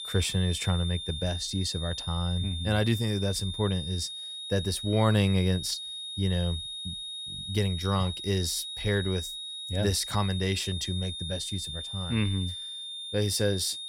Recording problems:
high-pitched whine; loud; throughout; 3.5 kHz, 6 dB below the speech

